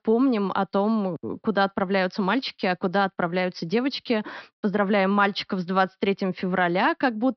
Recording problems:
high frequencies cut off; noticeable; nothing above 5.5 kHz

